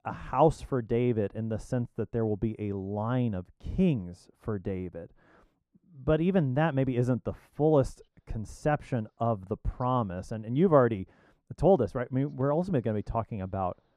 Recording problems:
muffled; very; fading above 2 kHz

